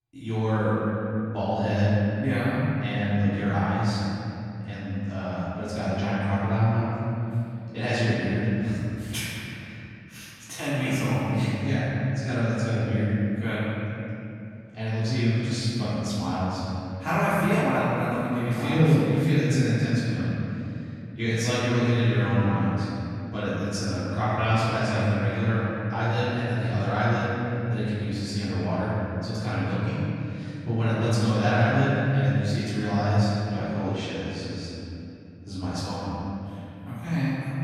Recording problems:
room echo; strong; dies away in 2.9 s
off-mic speech; far

